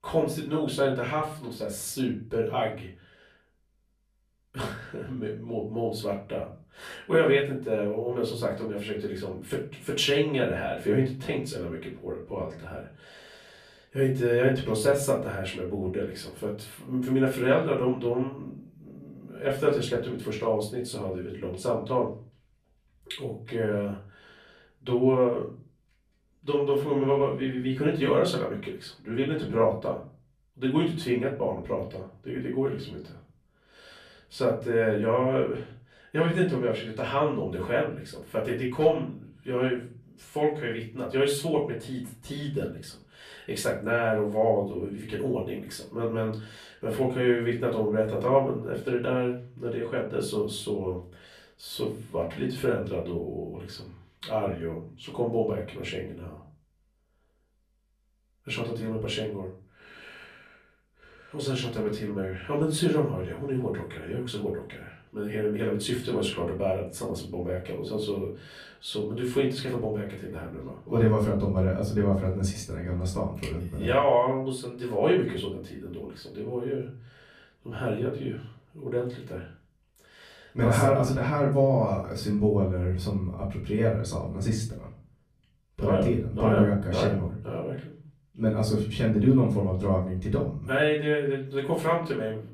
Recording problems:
off-mic speech; far
room echo; slight; dies away in 0.4 s

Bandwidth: 14.5 kHz